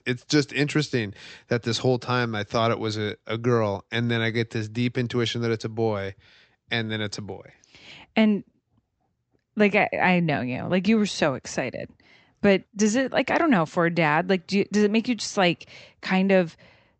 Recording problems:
high frequencies cut off; noticeable; nothing above 8 kHz

